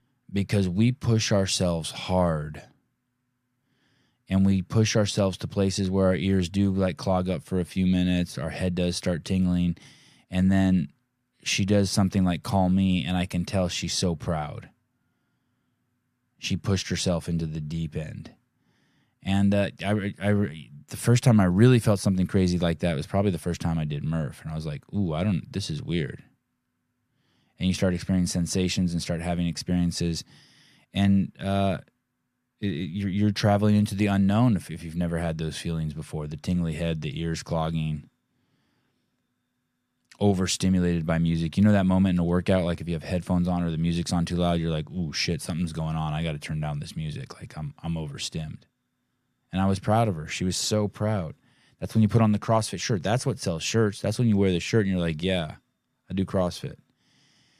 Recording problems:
none

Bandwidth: 14.5 kHz